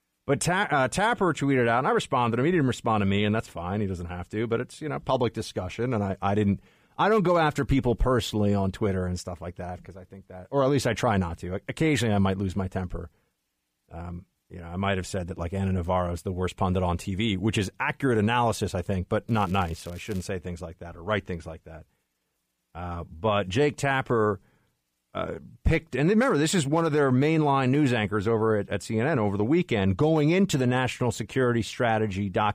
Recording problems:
crackling; faint; at 19 s; 25 dB below the speech

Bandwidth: 15 kHz